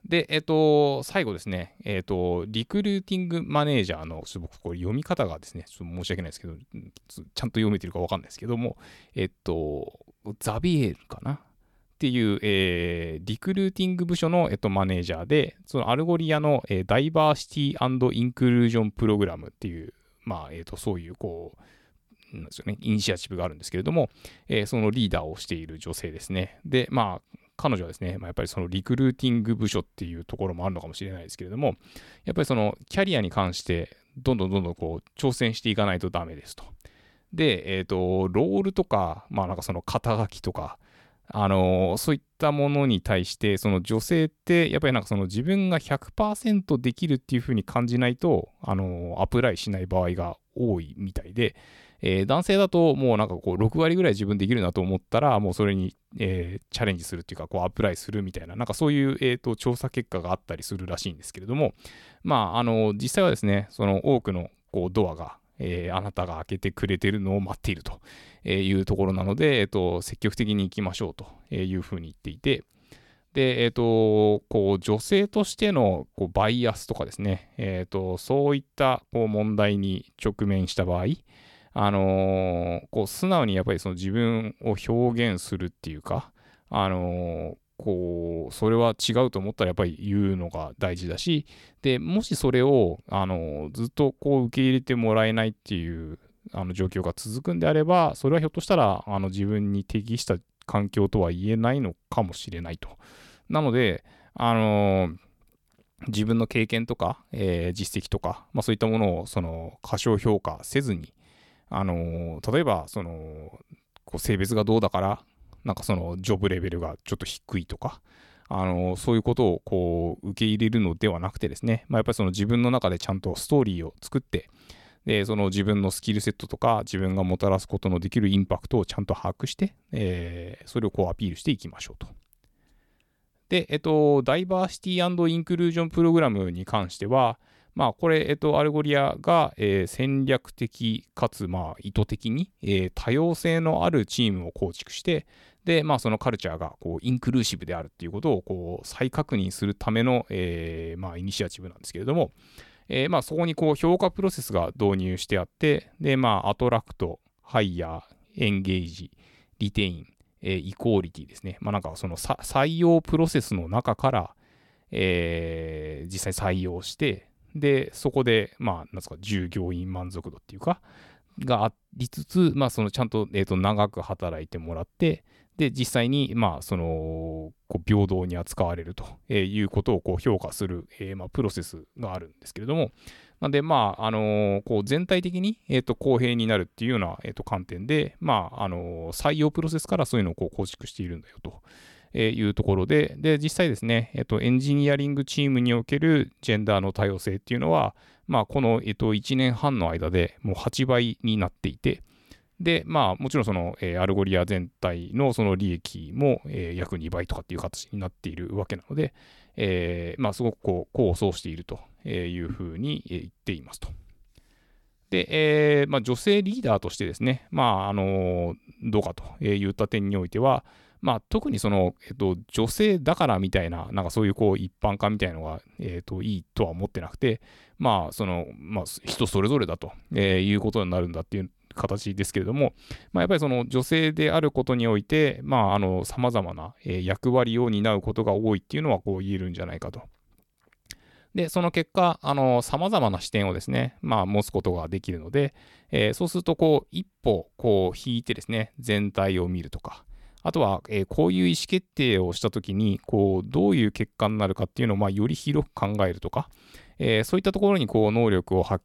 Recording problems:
none

